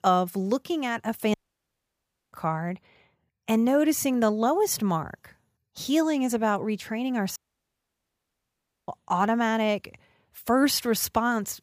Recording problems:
audio cutting out; at 1.5 s for 1 s and at 7.5 s for 1.5 s

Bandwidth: 15 kHz